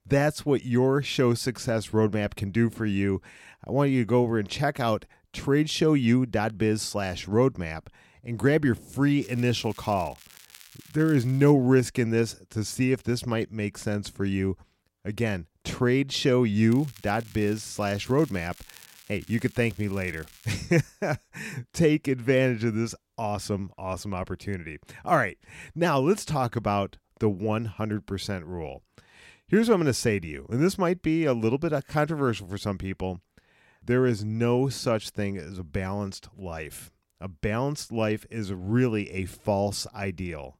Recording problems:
crackling; faint; from 9 to 12 s and from 17 to 21 s; 25 dB below the speech

